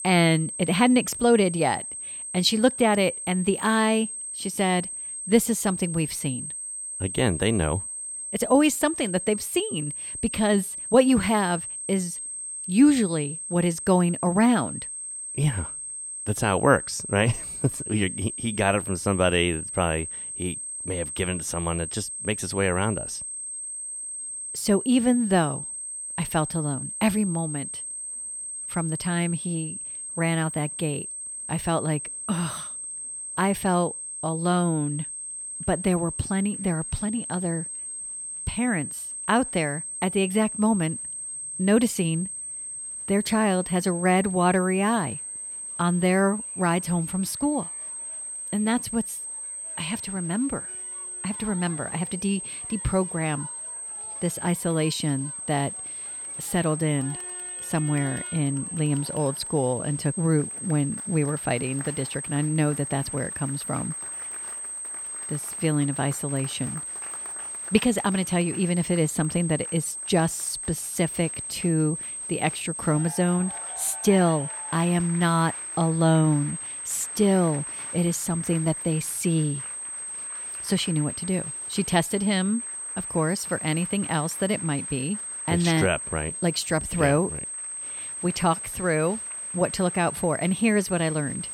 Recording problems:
high-pitched whine; loud; throughout; 8.5 kHz, 6 dB below the speech
crowd noise; faint; throughout; 25 dB below the speech

